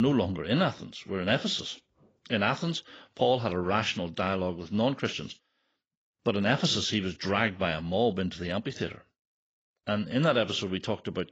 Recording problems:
garbled, watery; badly; nothing above 7.5 kHz
abrupt cut into speech; at the start

